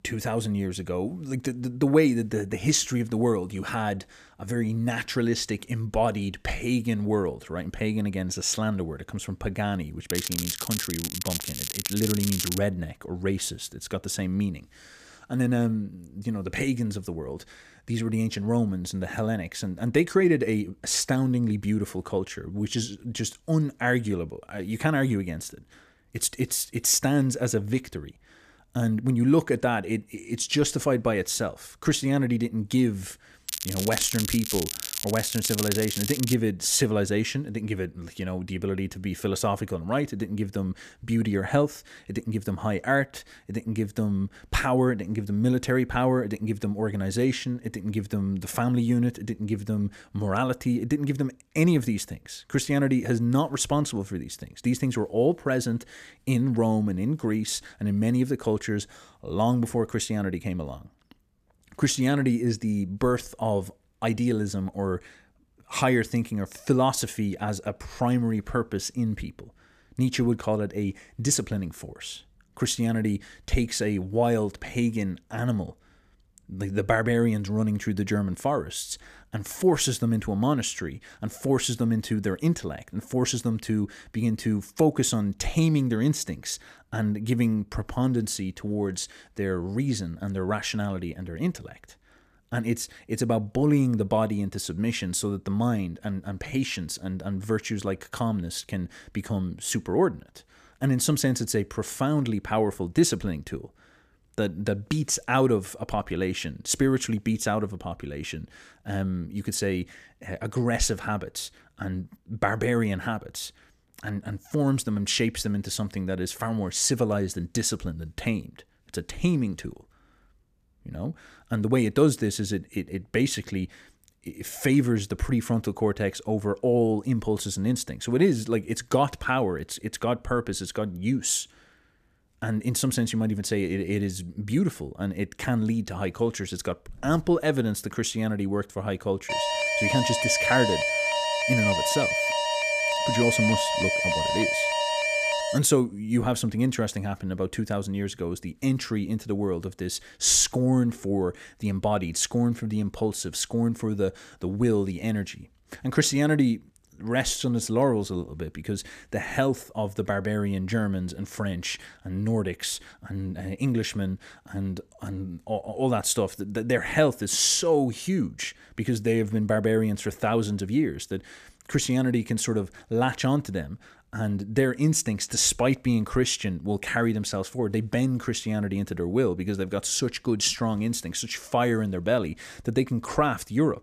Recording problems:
crackling; loud; from 10 to 13 s and from 33 to 36 s; 4 dB below the speech
alarm; loud; from 2:19 to 2:26; peak 3 dB above the speech

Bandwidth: 14.5 kHz